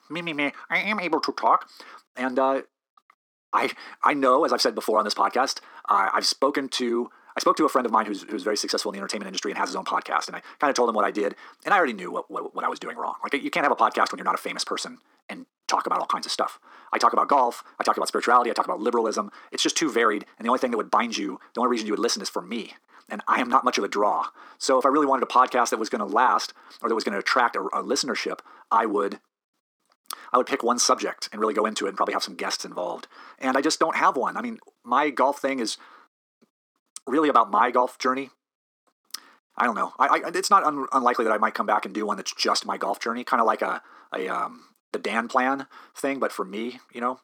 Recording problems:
wrong speed, natural pitch; too fast; 1.7 times normal speed
thin; somewhat; fading below 300 Hz

